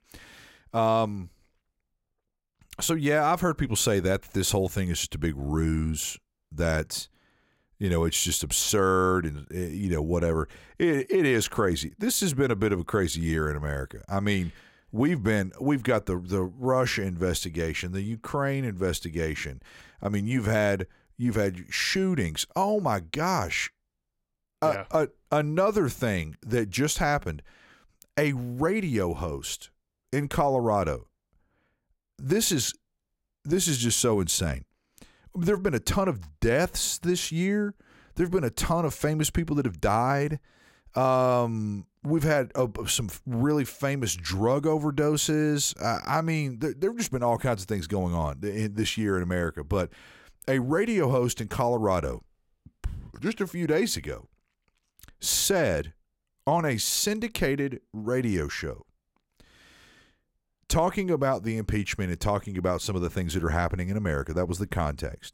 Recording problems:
none

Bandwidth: 16 kHz